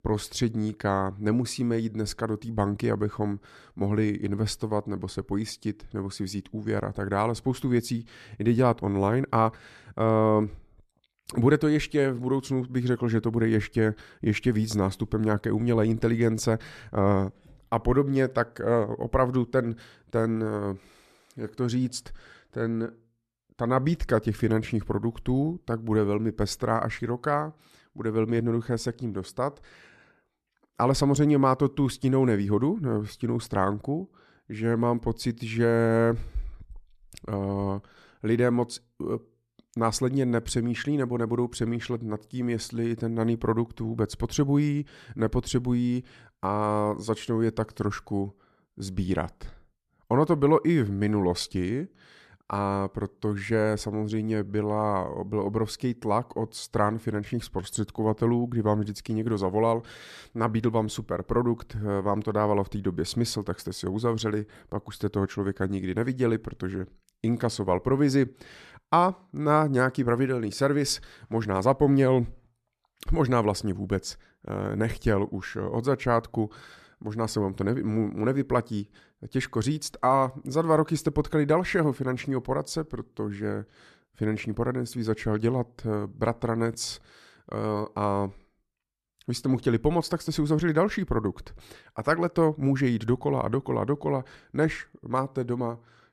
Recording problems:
none

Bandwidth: 13.5 kHz